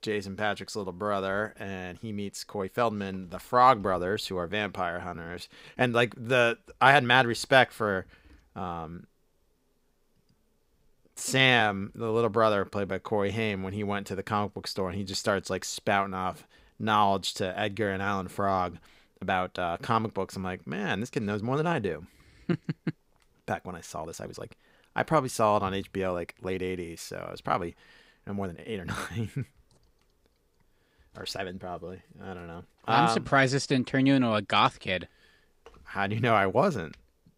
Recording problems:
uneven, jittery; strongly; from 2 to 33 s

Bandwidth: 15.5 kHz